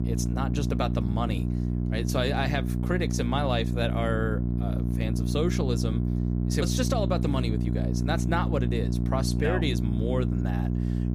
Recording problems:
electrical hum; loud; throughout; 60 Hz, 5 dB below the speech

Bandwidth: 15 kHz